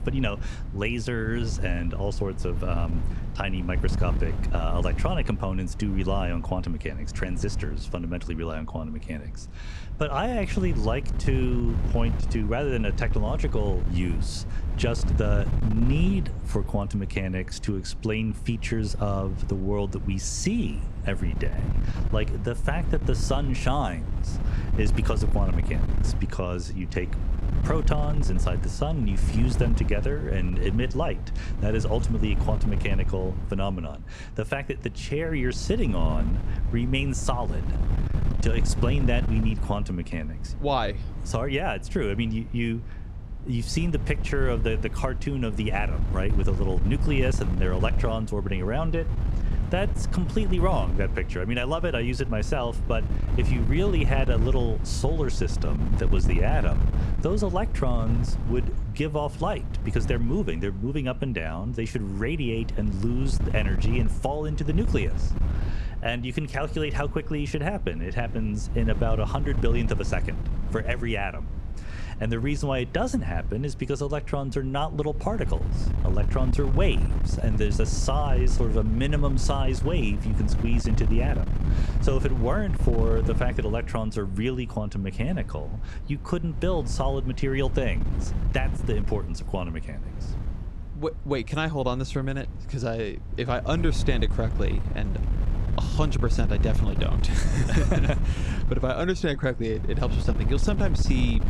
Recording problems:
wind noise on the microphone; occasional gusts; 10 dB below the speech

